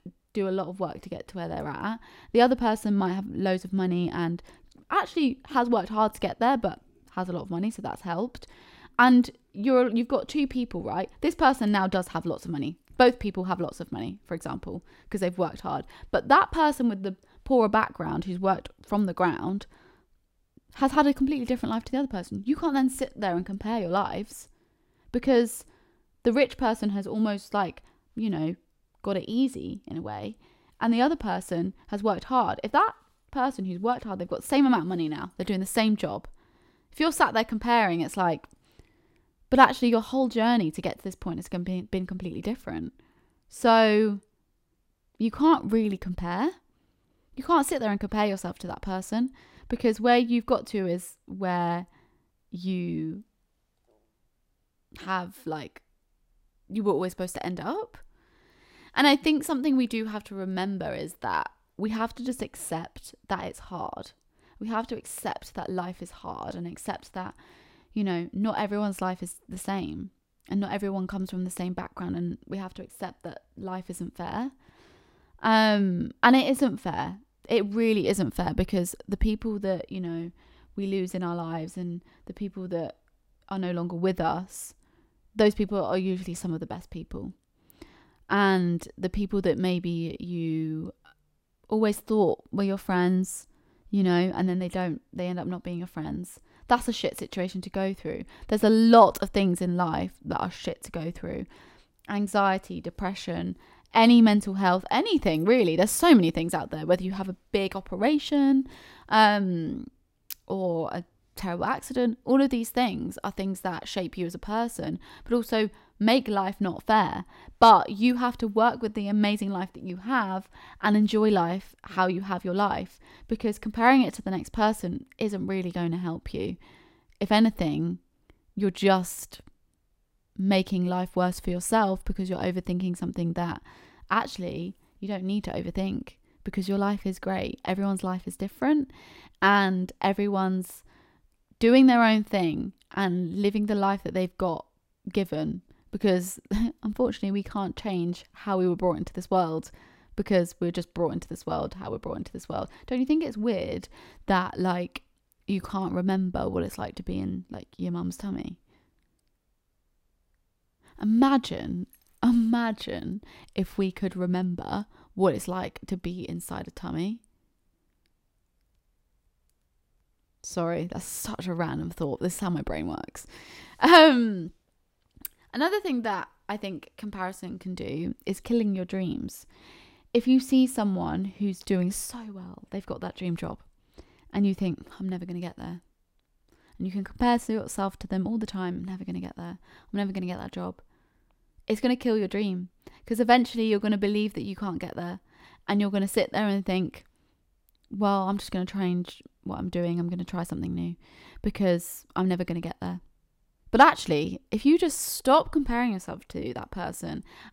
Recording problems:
none

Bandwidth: 16 kHz